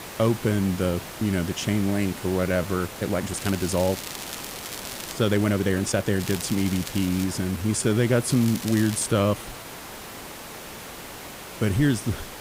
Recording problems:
hiss; noticeable; throughout; 10 dB below the speech
crackling; noticeable; from 3.5 to 5 s, from 6 to 7 s and at 8.5 s; 10 dB below the speech
uneven, jittery; strongly; from 2.5 to 9.5 s

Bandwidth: 15.5 kHz